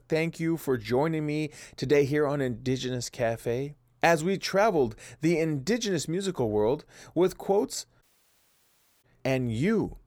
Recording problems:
audio cutting out; at 8 s for 1 s

